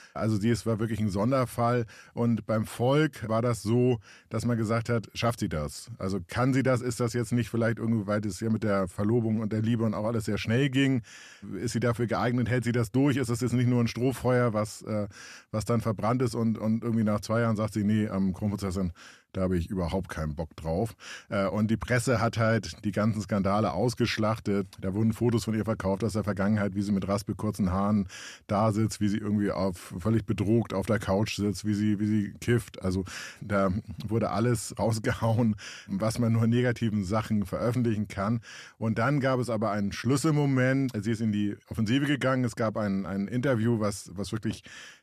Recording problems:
none

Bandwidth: 14.5 kHz